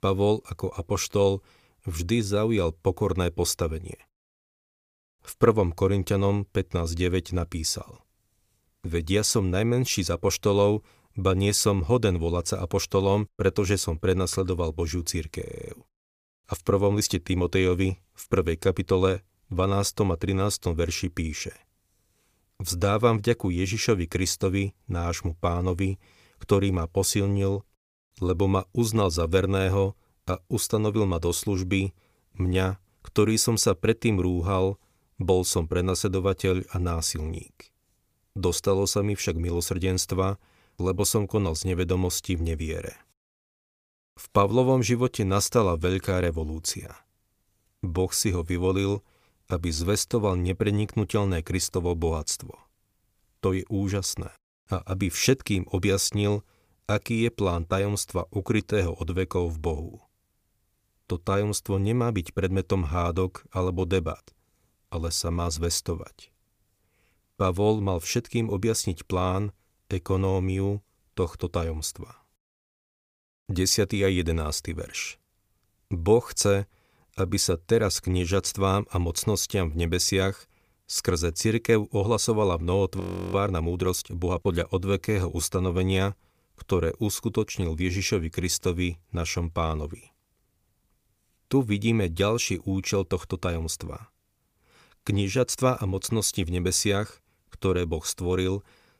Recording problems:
audio freezing; at 15 s and at 1:23

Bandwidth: 15 kHz